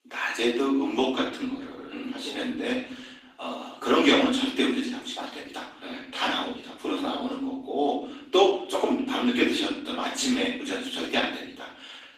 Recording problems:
off-mic speech; far
room echo; noticeable; dies away in 0.6 s
garbled, watery; slightly; nothing above 15 kHz
thin; very slightly; fading below 250 Hz

